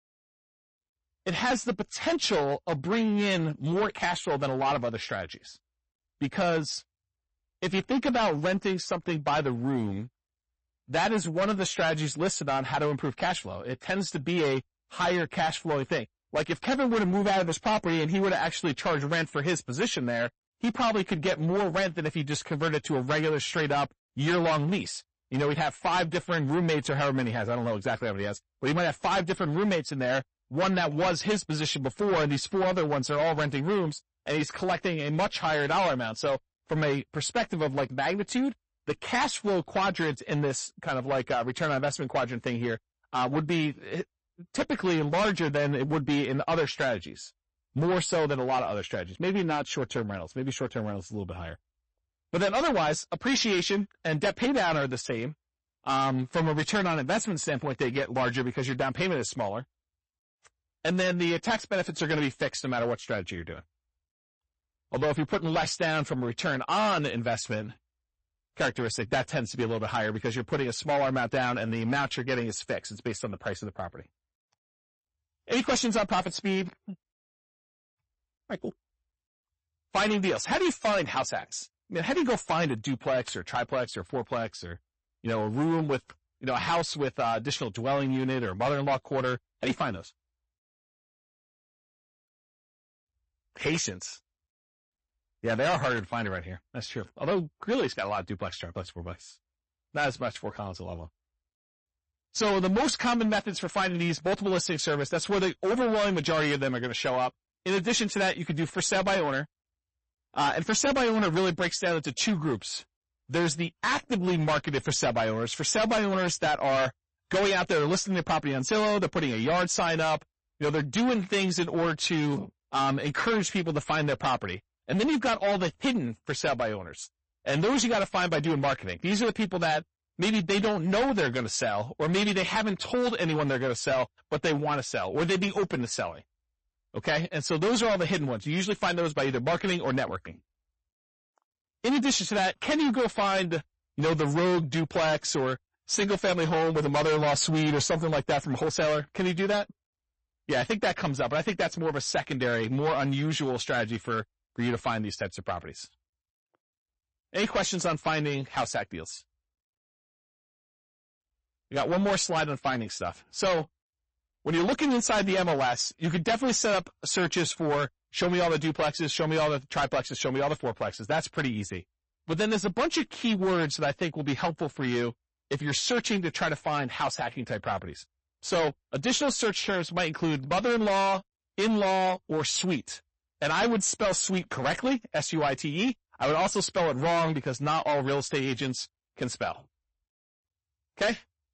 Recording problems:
distortion; heavy; 12% of the sound clipped
garbled, watery; slightly; nothing above 8 kHz

